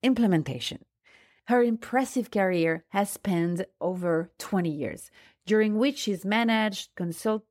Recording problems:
none

